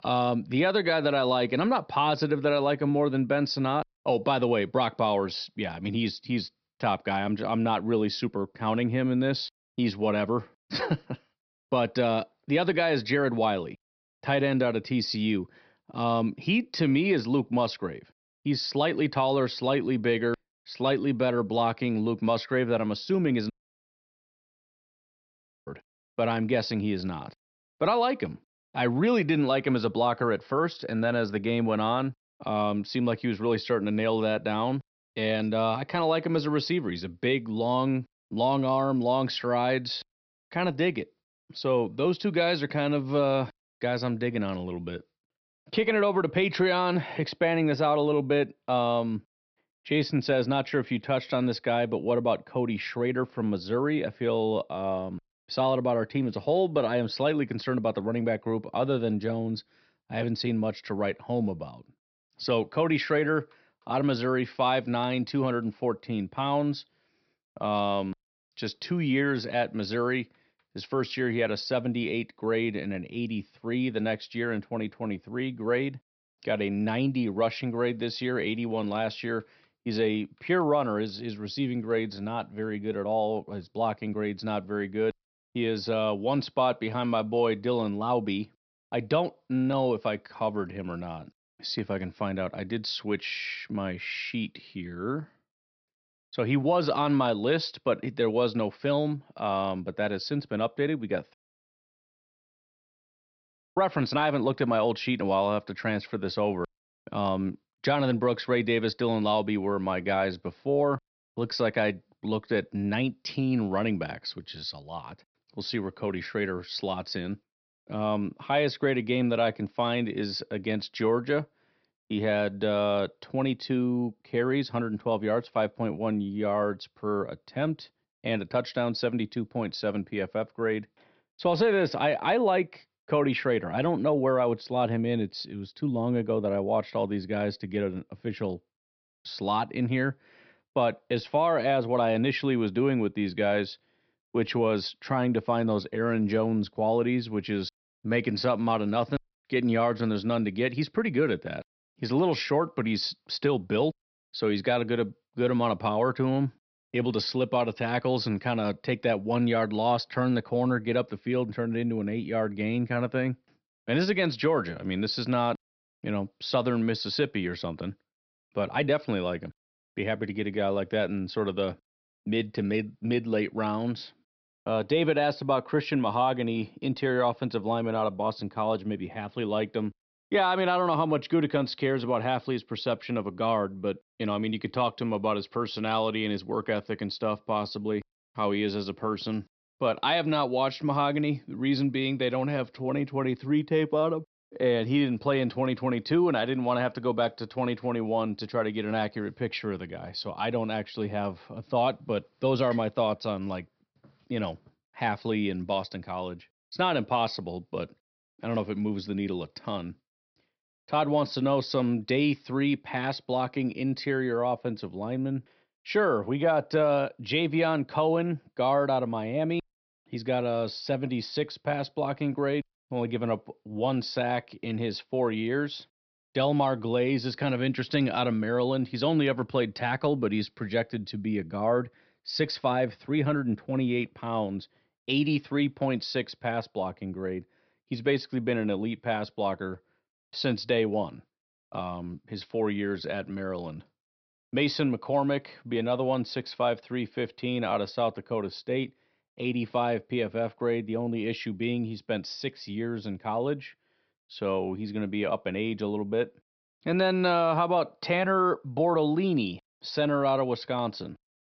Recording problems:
high frequencies cut off; noticeable; nothing above 5.5 kHz
audio cutting out; at 24 s for 2 s and at 1:41 for 2.5 s

